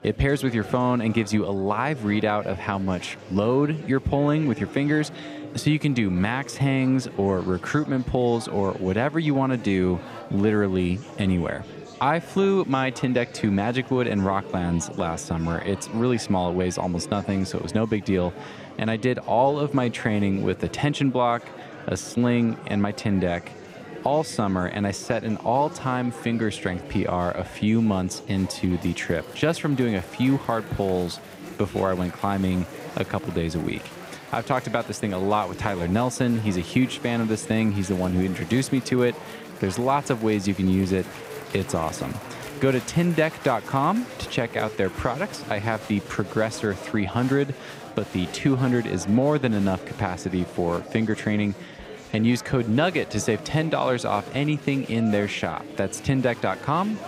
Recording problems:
chatter from many people; noticeable; throughout; 15 dB below the speech

